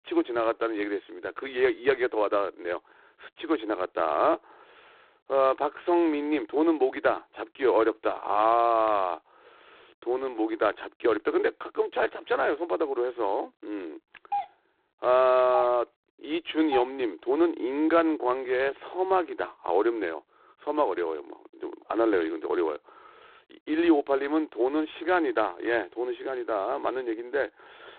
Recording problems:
phone-call audio; poor line; nothing above 4 kHz
doorbell; noticeable; from 14 to 17 s; peak 6 dB below the speech

